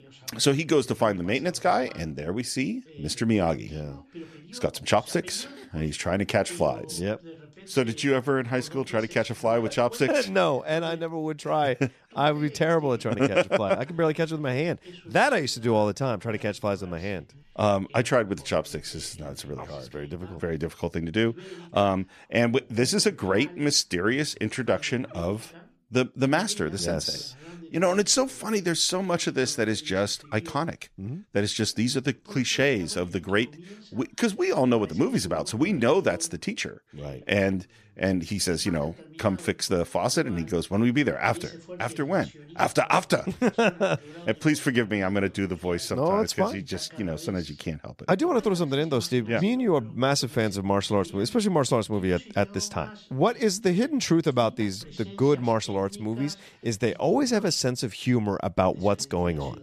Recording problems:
voice in the background; faint; throughout; 20 dB below the speech

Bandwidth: 14.5 kHz